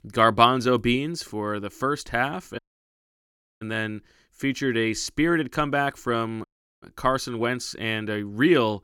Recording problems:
audio cutting out; at 2.5 s for 1 s and at 6.5 s

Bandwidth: 17.5 kHz